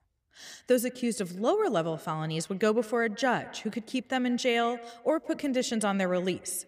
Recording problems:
echo of what is said; faint; throughout; 170 ms later, 20 dB below the speech

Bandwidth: 15 kHz